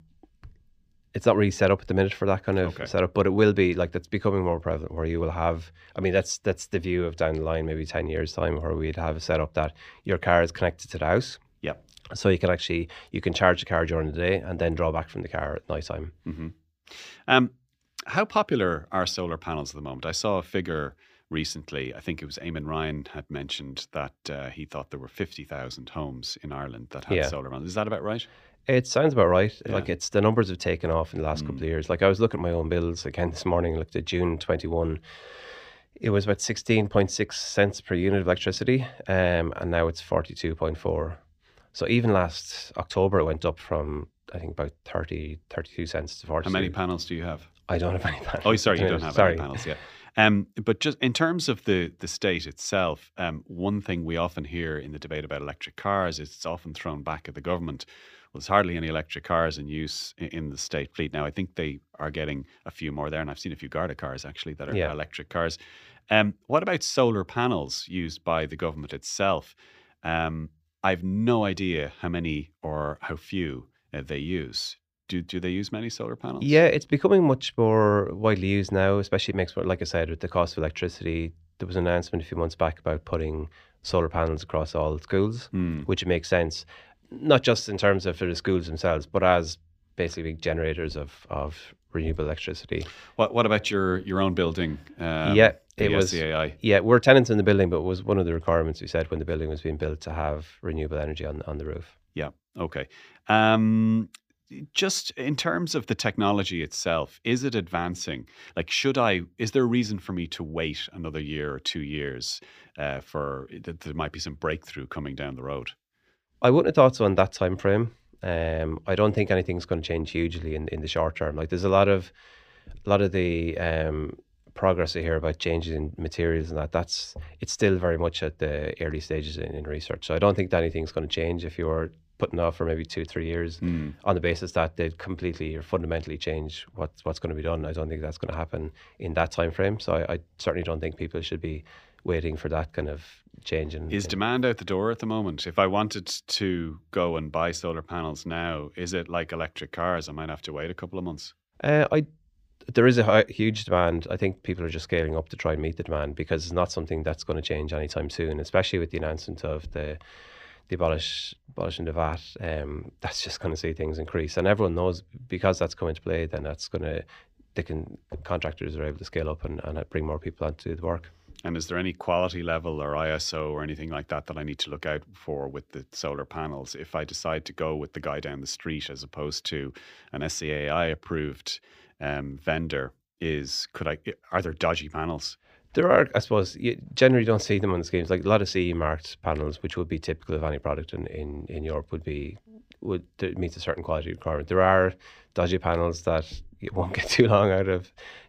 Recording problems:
none

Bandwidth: 15 kHz